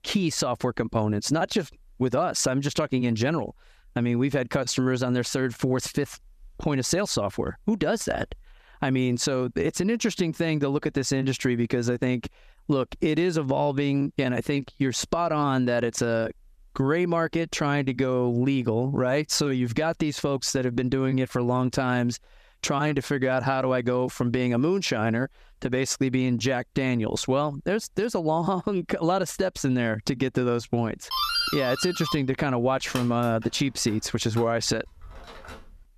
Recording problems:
squashed, flat; somewhat
doorbell; loud; from 31 s on; peak 2 dB above the speech

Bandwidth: 14.5 kHz